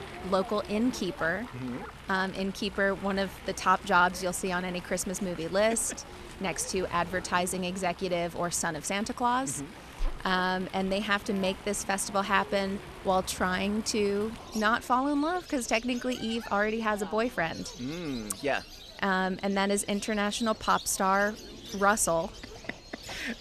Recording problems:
animal sounds; noticeable; throughout; 15 dB below the speech

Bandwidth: 13.5 kHz